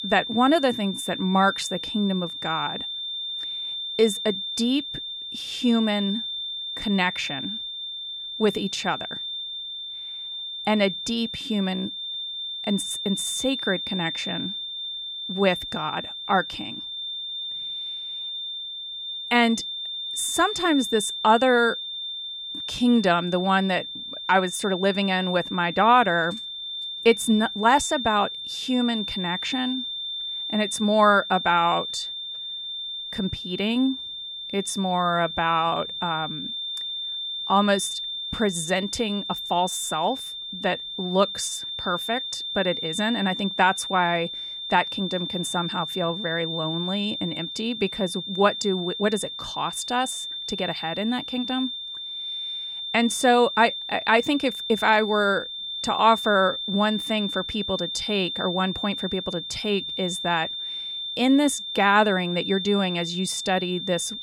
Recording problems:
high-pitched whine; loud; throughout; 3.5 kHz, 6 dB below the speech

